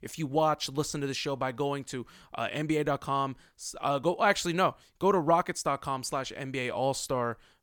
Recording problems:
none

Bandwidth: 18 kHz